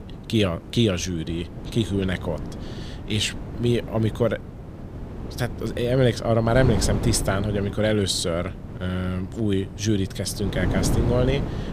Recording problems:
wind noise on the microphone; occasional gusts; 10 dB below the speech

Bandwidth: 15 kHz